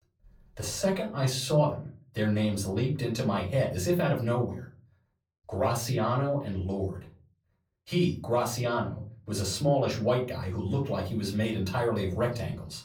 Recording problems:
off-mic speech; far
room echo; very slight; dies away in 0.3 s

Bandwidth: 18.5 kHz